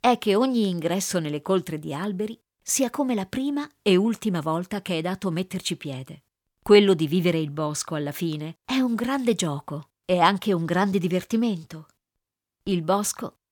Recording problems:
none

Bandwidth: 18.5 kHz